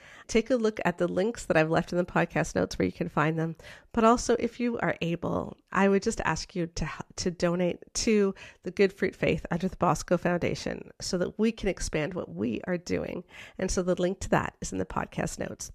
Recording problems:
none

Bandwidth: 14 kHz